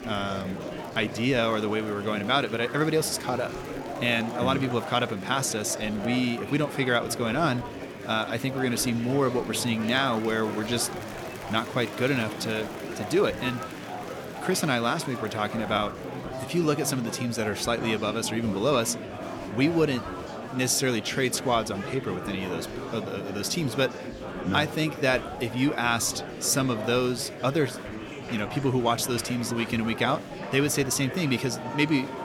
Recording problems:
murmuring crowd; loud; throughout; 9 dB below the speech

